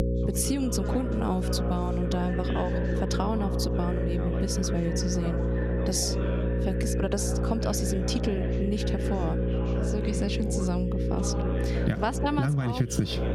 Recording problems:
squashed, flat; somewhat
electrical hum; loud; throughout; 60 Hz, 3 dB below the speech
background chatter; loud; throughout; 2 voices, 9 dB below the speech

